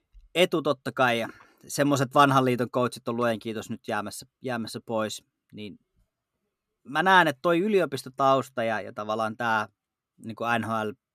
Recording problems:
none

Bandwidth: 14.5 kHz